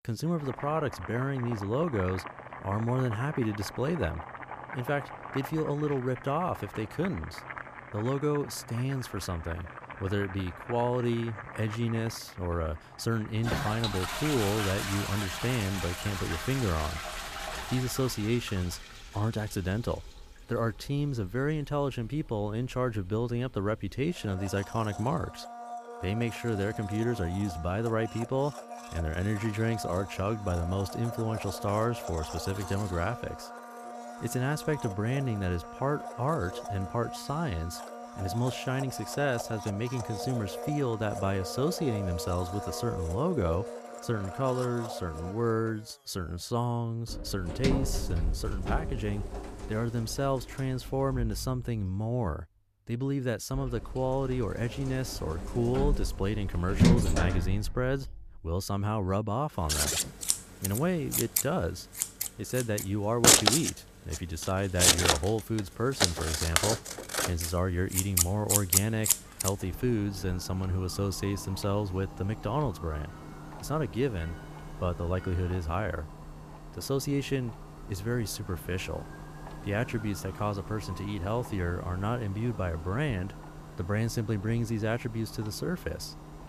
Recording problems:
household noises; loud; throughout; 2 dB below the speech

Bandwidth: 14.5 kHz